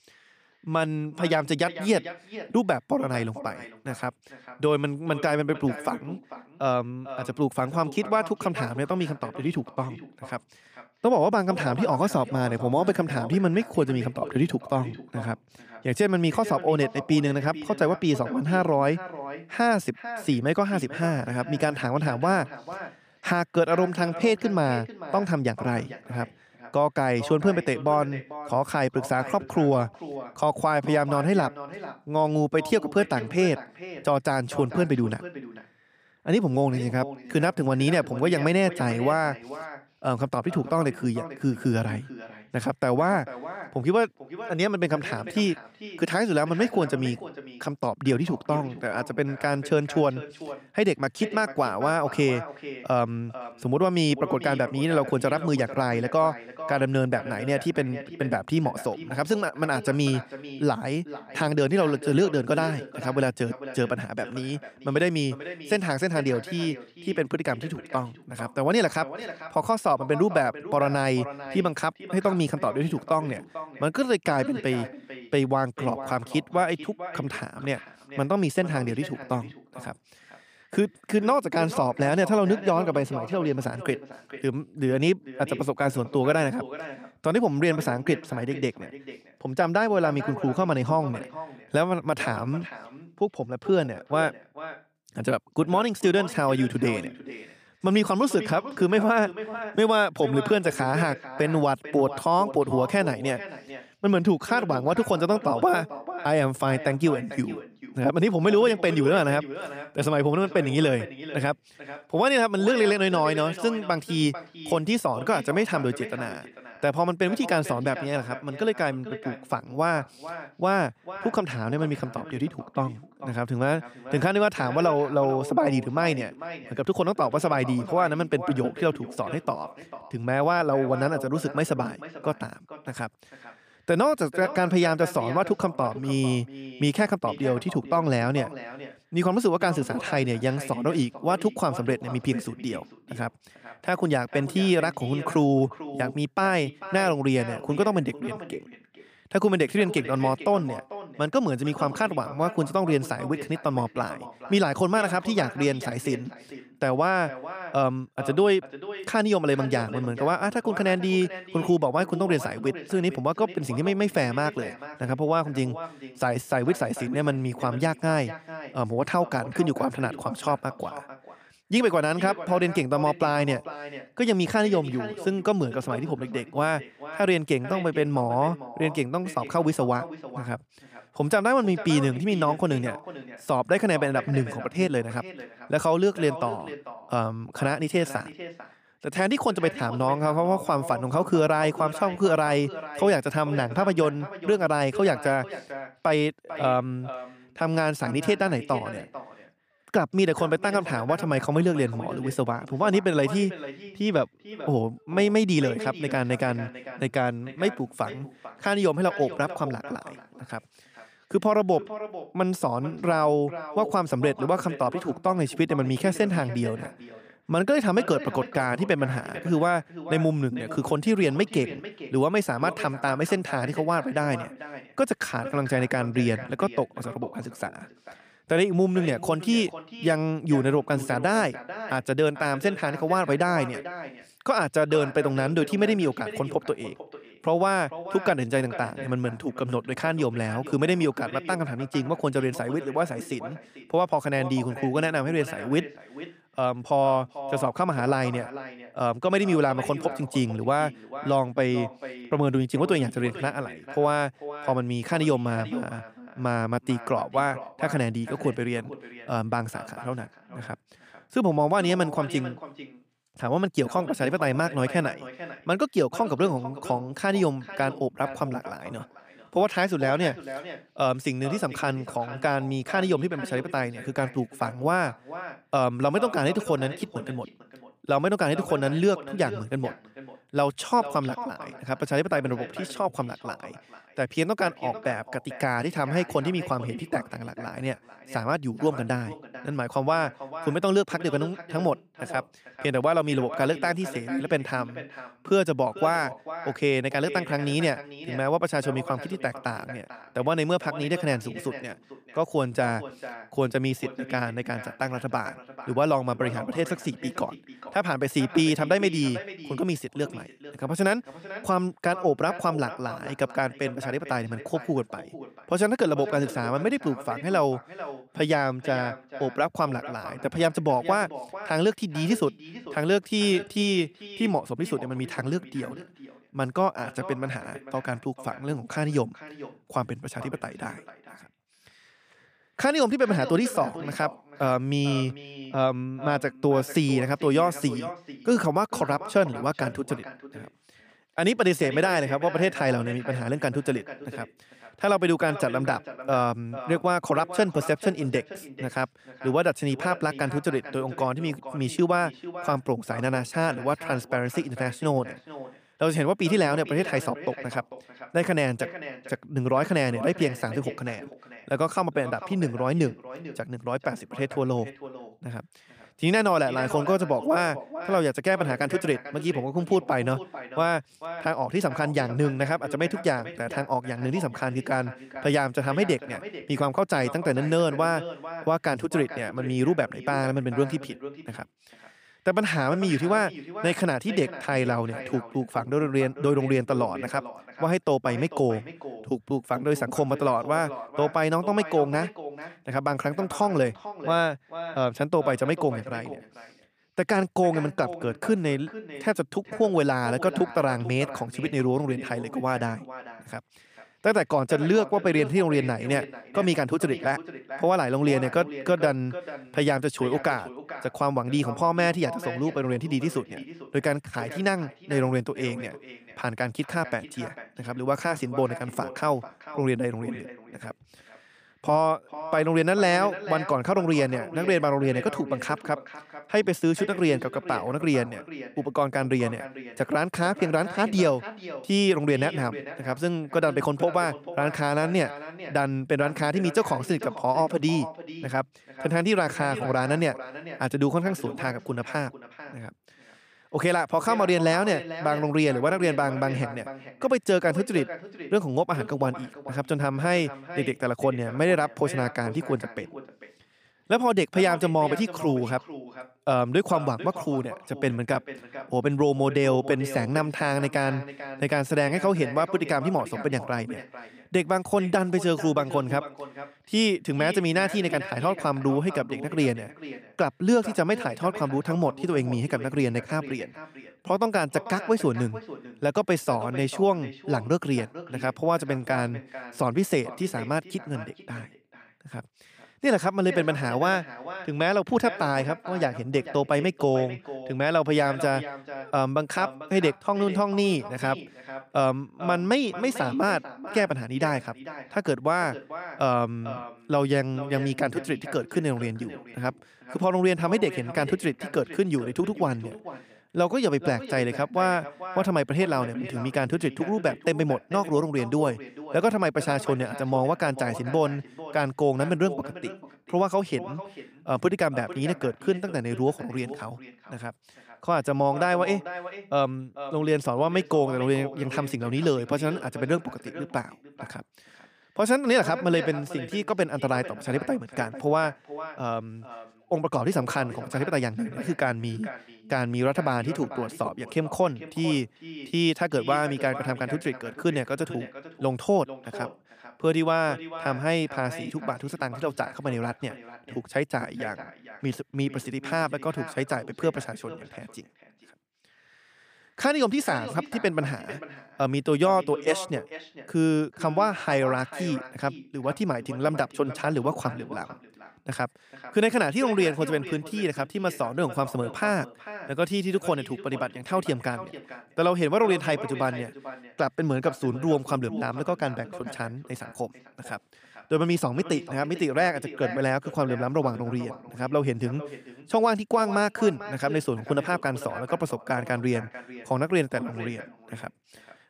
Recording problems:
echo of what is said; noticeable; throughout; 440 ms later, 15 dB below the speech

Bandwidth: 15 kHz